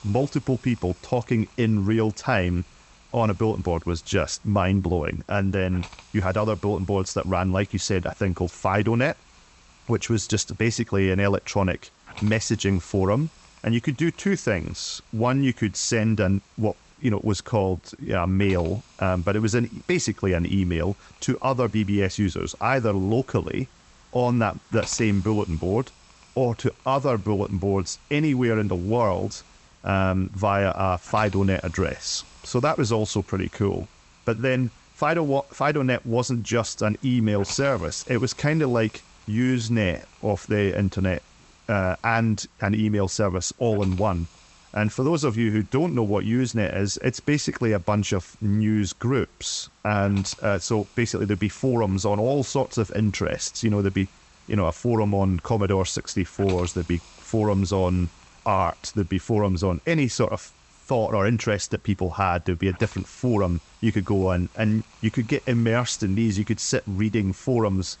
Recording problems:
high frequencies cut off; noticeable; nothing above 8 kHz
hiss; faint; throughout; 25 dB below the speech

